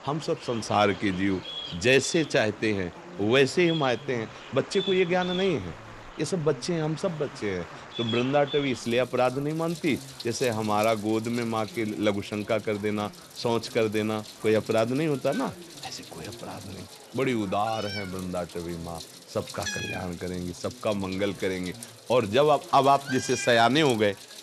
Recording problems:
animal sounds; noticeable; throughout; 15 dB below the speech
murmuring crowd; faint; throughout; 20 dB below the speech

